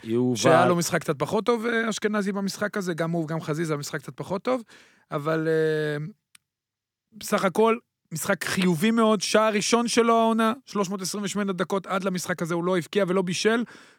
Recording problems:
none

